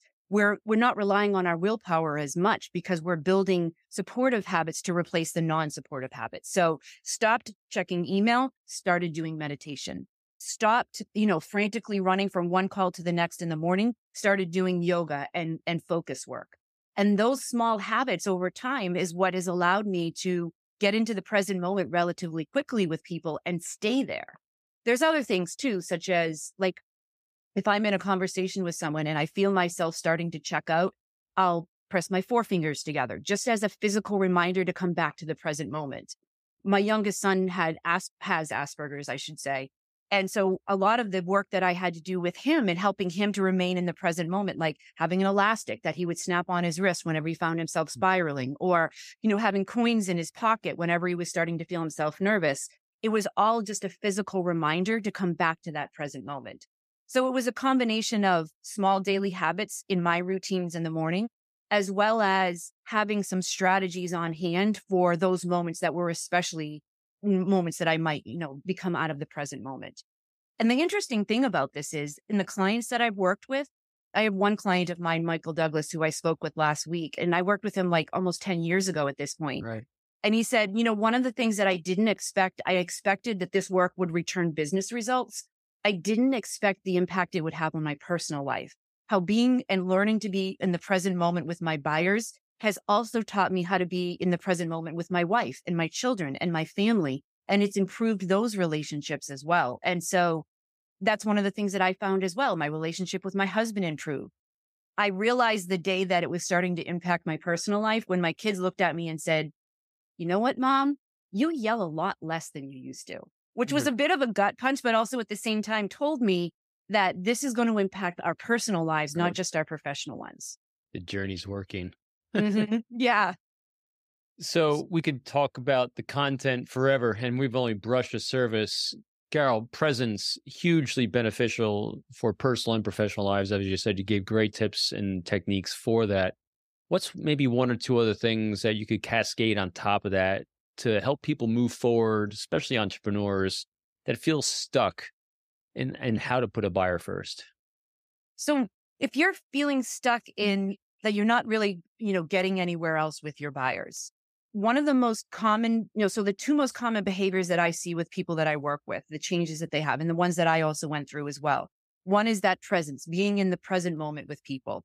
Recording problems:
none

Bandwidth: 15 kHz